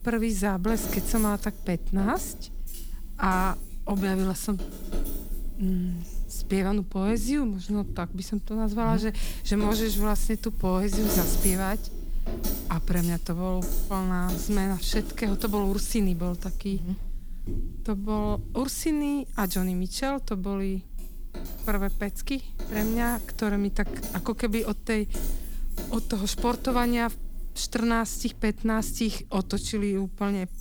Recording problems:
household noises; loud; throughout; 8 dB below the speech

